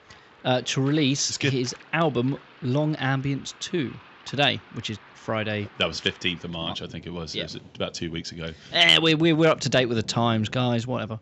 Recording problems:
rain or running water; faint; throughout; 25 dB below the speech

